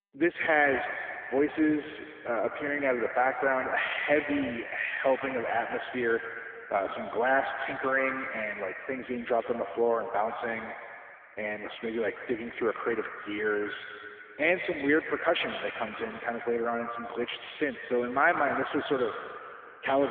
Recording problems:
phone-call audio; poor line; nothing above 3.5 kHz
echo of what is said; strong; throughout; 130 ms later, 8 dB below the speech
abrupt cut into speech; at the end

